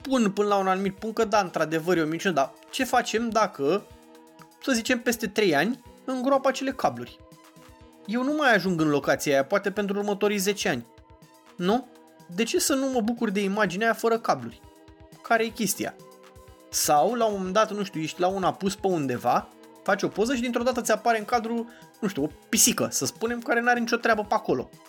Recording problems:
background music; faint; throughout; 25 dB below the speech

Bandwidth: 17 kHz